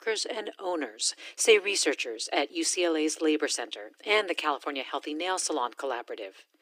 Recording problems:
thin; very; fading below 300 Hz

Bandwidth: 15 kHz